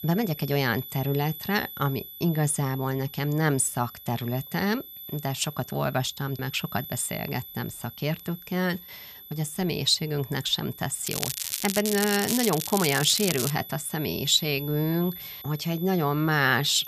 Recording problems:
crackling; loud; from 11 to 14 s; 3 dB below the speech
high-pitched whine; noticeable; throughout; 12 kHz, 15 dB below the speech

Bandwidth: 14.5 kHz